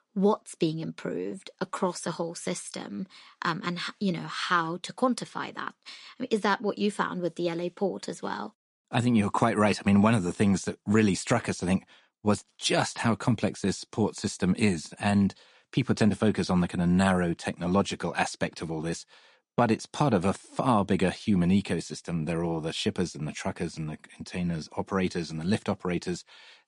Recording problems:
garbled, watery; slightly; nothing above 10.5 kHz

